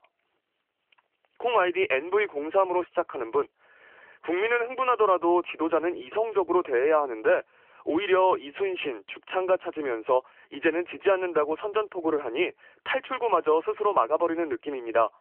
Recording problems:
thin; very; fading below 300 Hz
phone-call audio; nothing above 3 kHz

